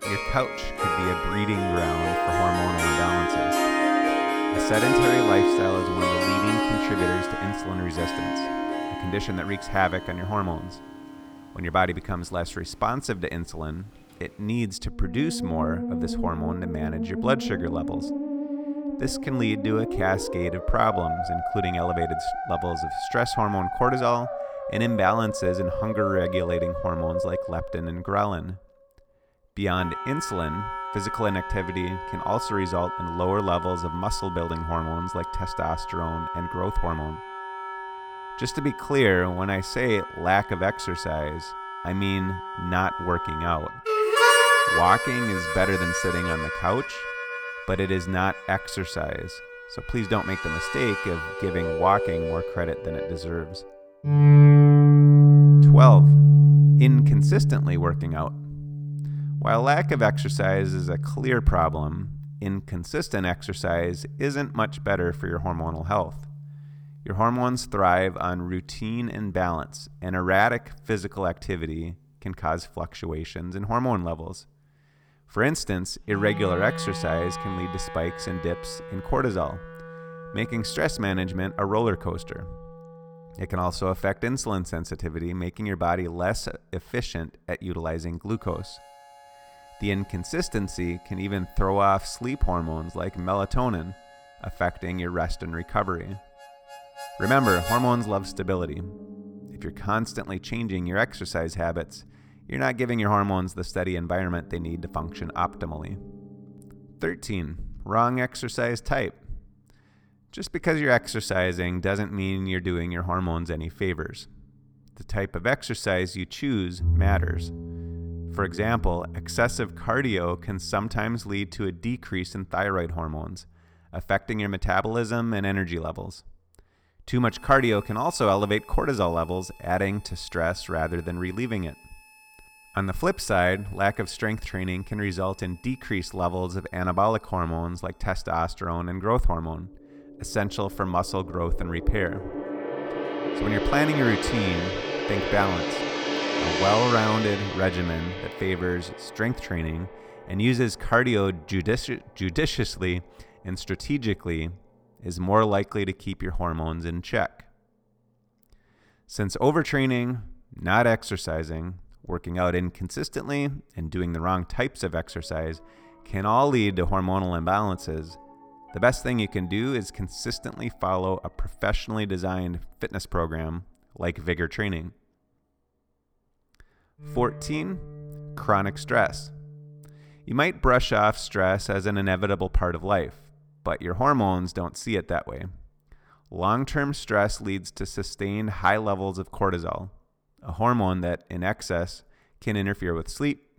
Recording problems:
background music; very loud; throughout; 2 dB above the speech

